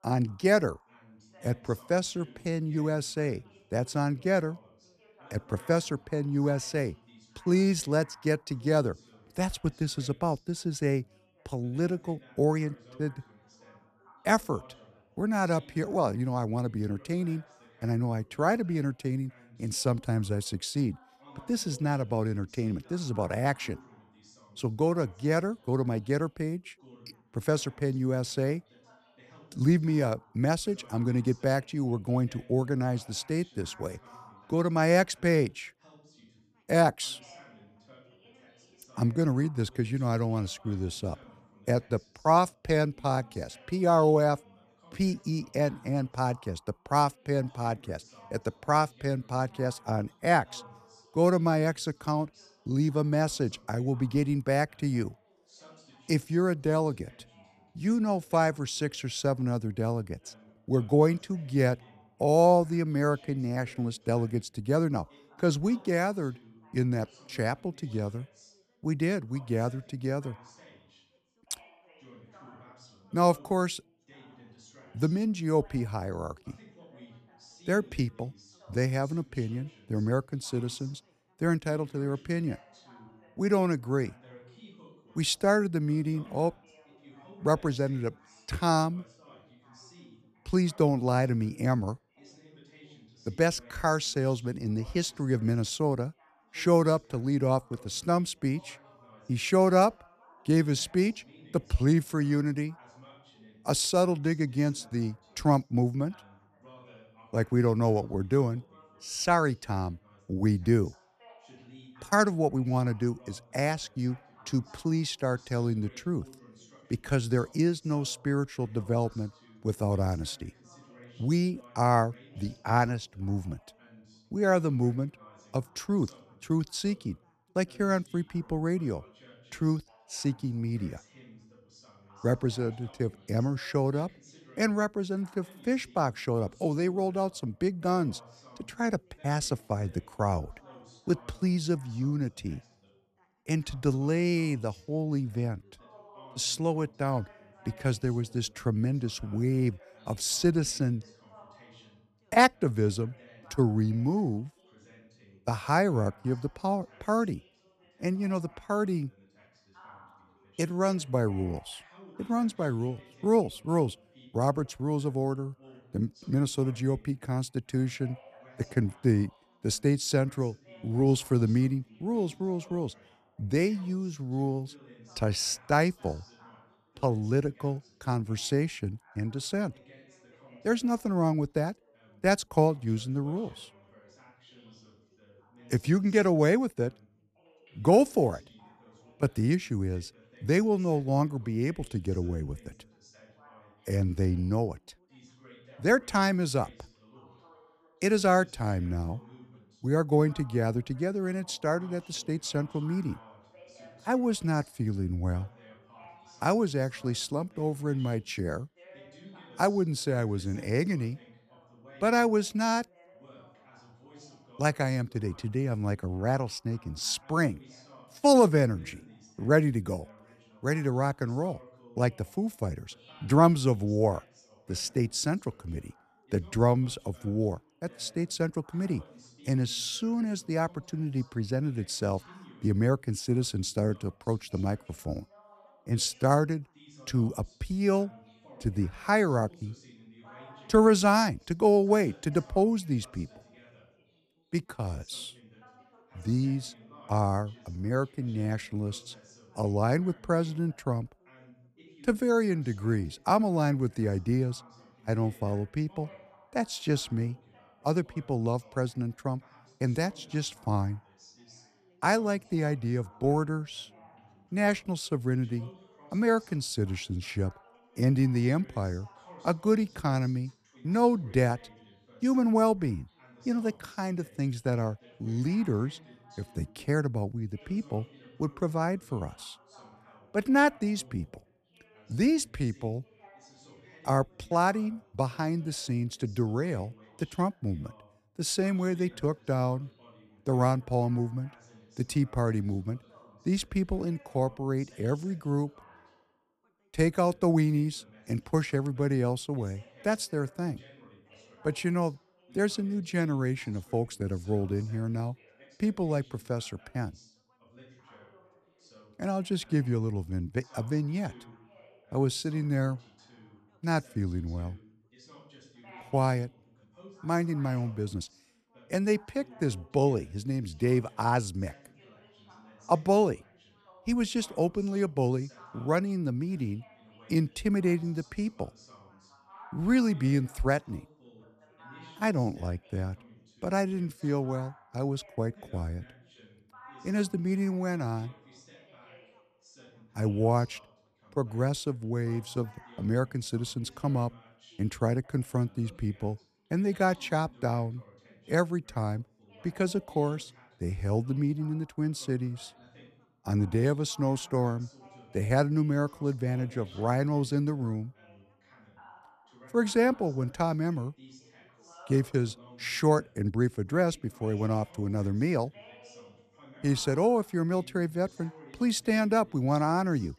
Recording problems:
background chatter; faint; throughout; 3 voices, 25 dB below the speech

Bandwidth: 14 kHz